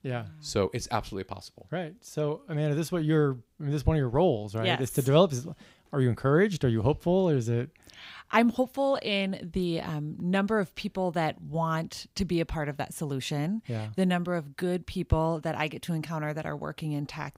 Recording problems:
none

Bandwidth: 15.5 kHz